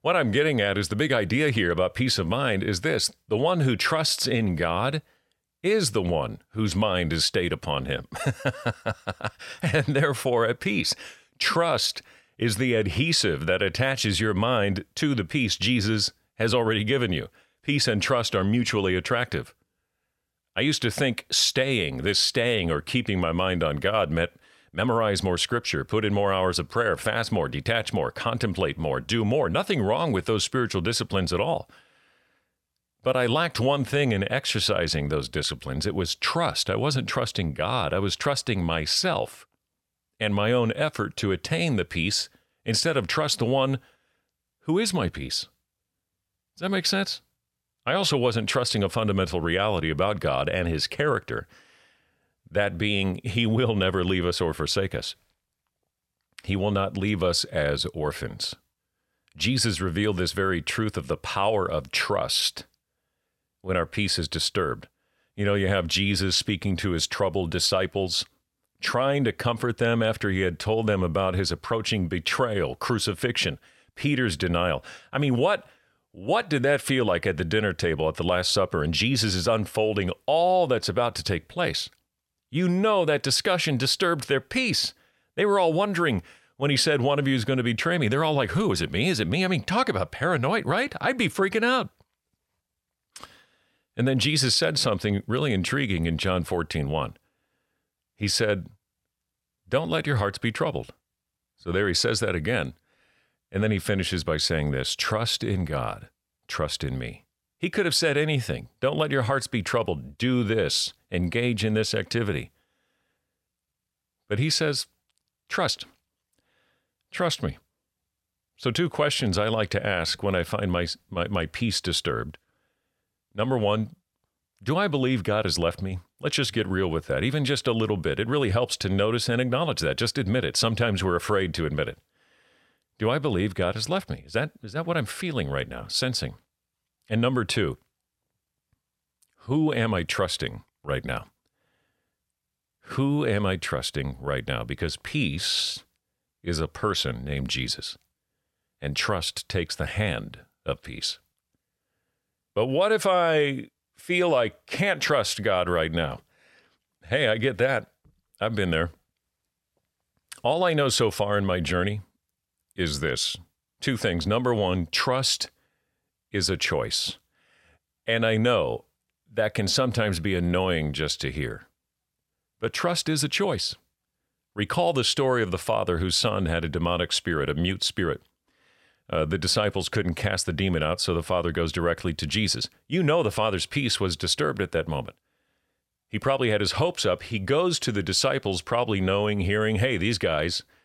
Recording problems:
none

